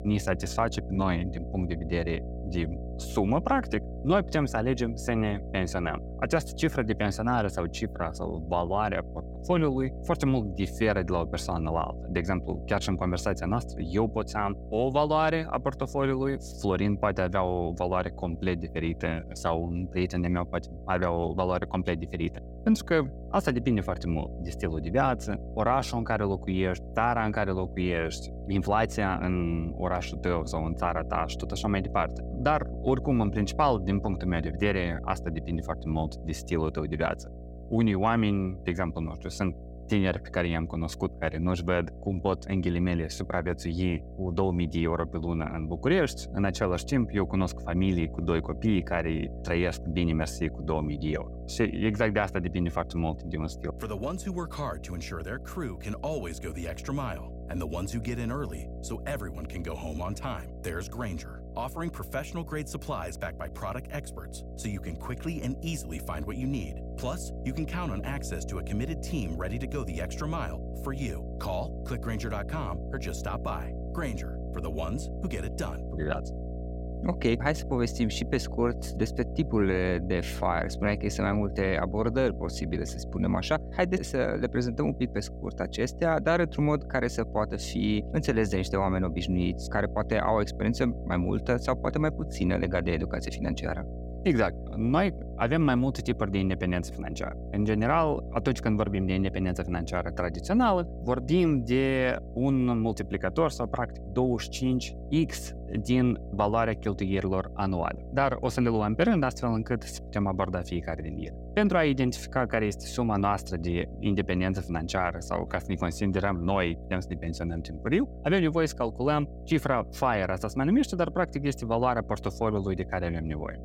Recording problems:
electrical hum; noticeable; throughout; 60 Hz, 15 dB below the speech

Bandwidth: 16 kHz